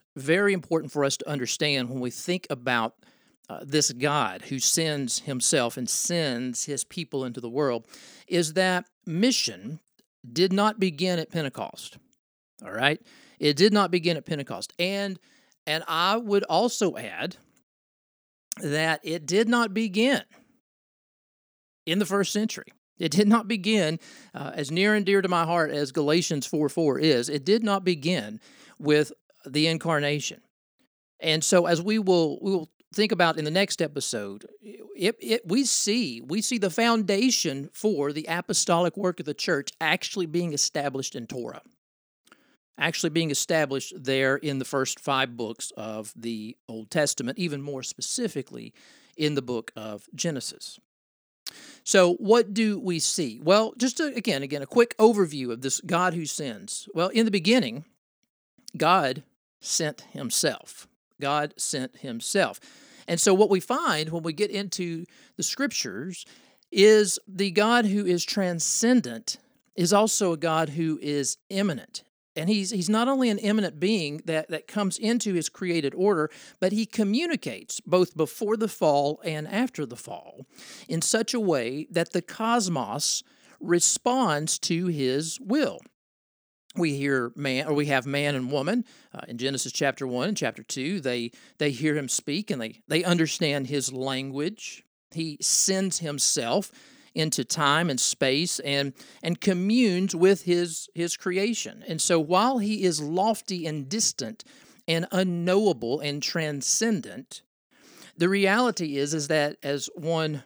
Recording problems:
none

